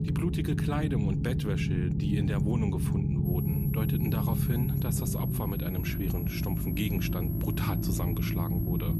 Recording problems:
electrical hum; loud; from 4.5 s on; 50 Hz, 10 dB below the speech
high-pitched whine; loud; from 3.5 s on; 11.5 kHz, 7 dB below the speech
low rumble; loud; throughout; 1 dB below the speech

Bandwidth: 14 kHz